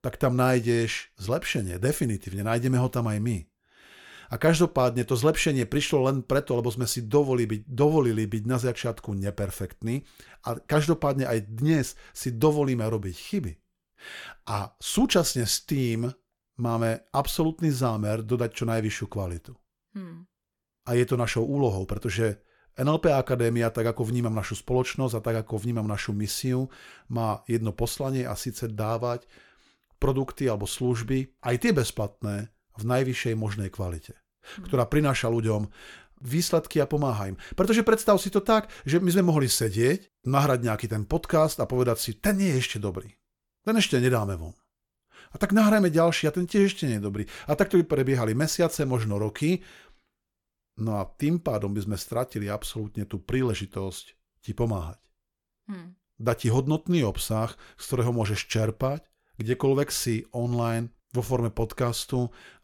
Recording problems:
none

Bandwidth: 17.5 kHz